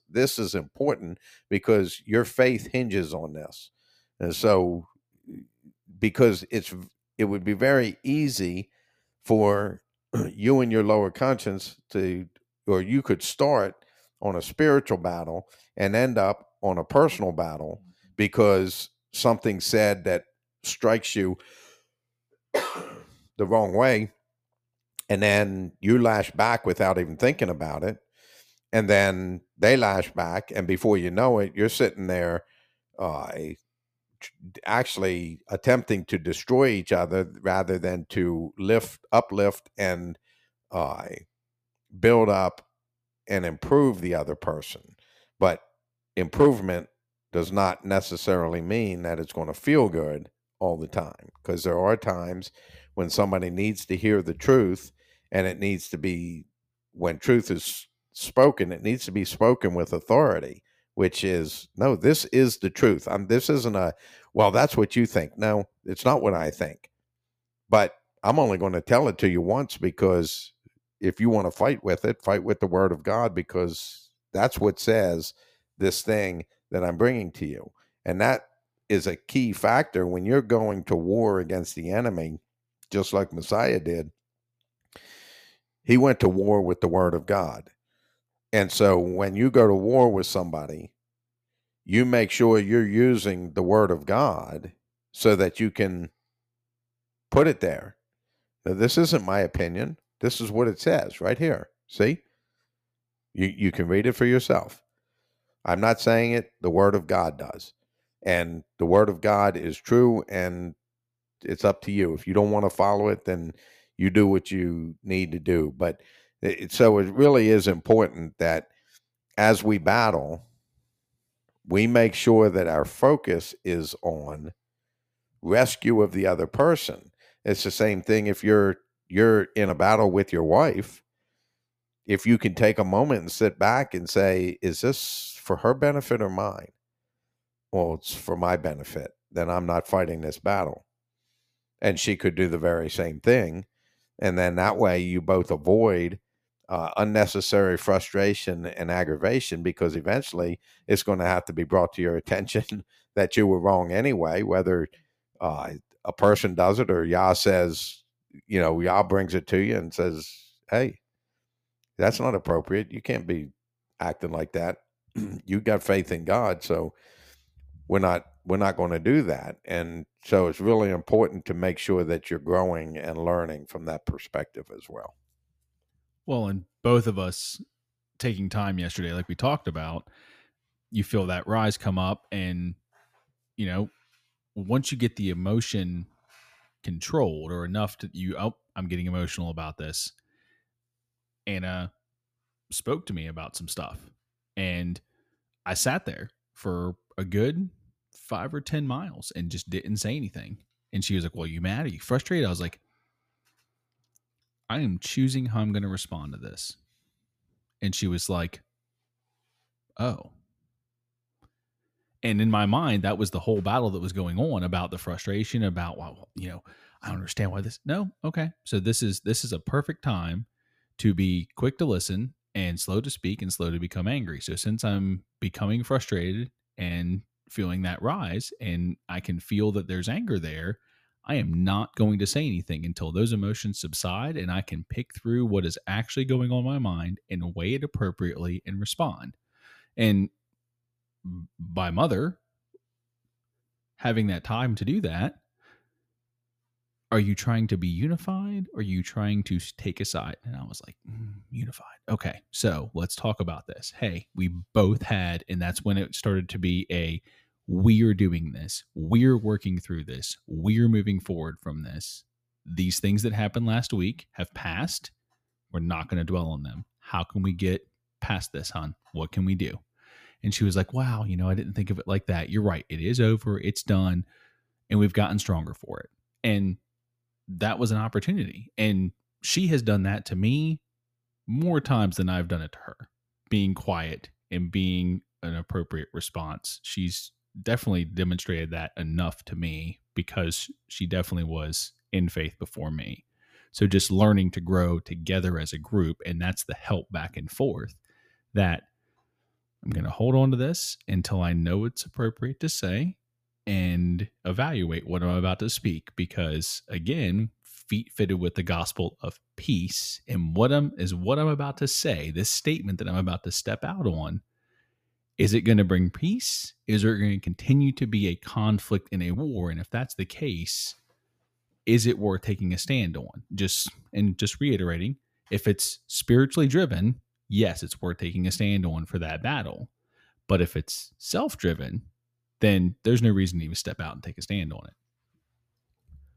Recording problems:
none

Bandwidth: 15 kHz